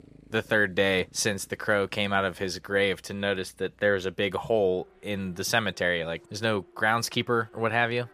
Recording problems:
traffic noise; faint; throughout; 30 dB below the speech

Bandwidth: 14.5 kHz